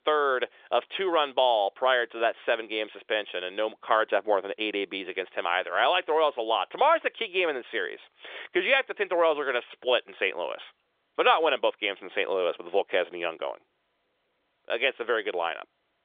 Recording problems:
phone-call audio; nothing above 3.5 kHz

